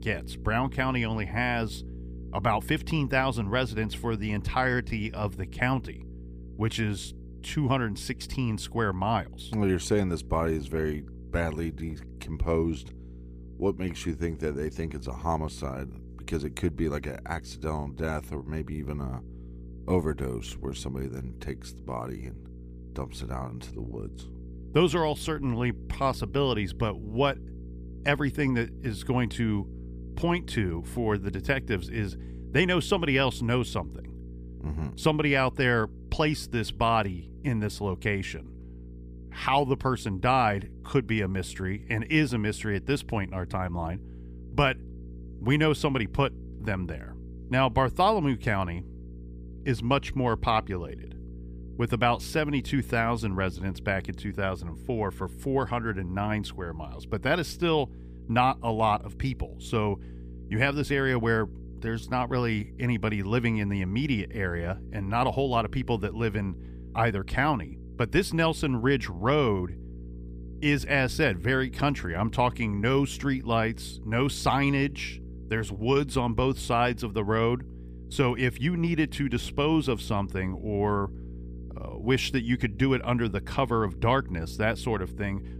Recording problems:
electrical hum; faint; throughout; 60 Hz, 25 dB below the speech

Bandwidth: 15 kHz